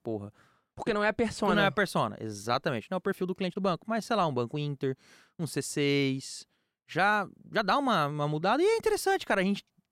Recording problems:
uneven, jittery; strongly; from 0.5 to 8.5 s

